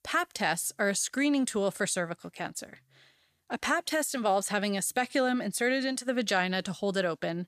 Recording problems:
none

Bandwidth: 14.5 kHz